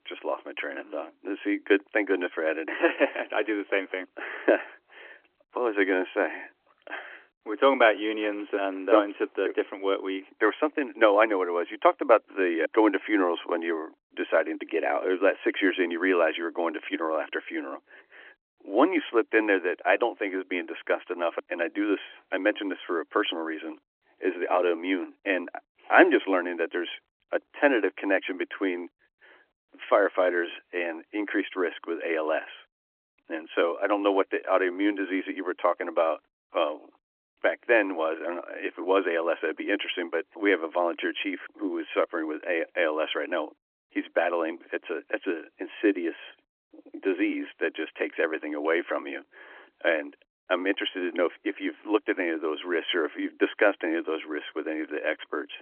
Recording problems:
phone-call audio; nothing above 3.5 kHz

